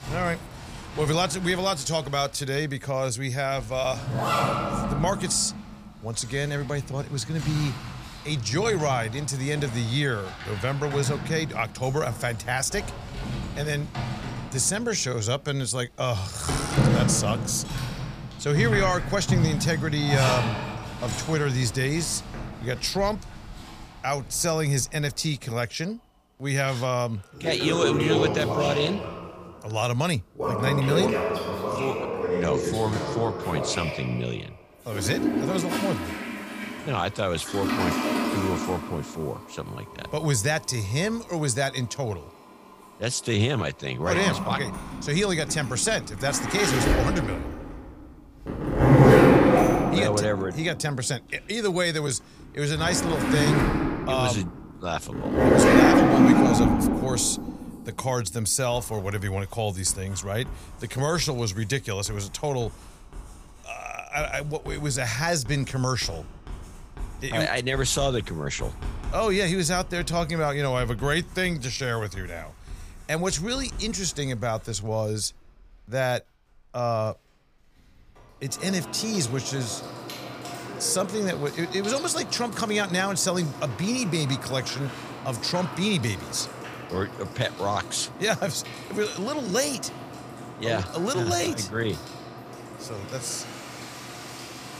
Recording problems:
household noises; very loud; throughout; as loud as the speech

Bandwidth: 15 kHz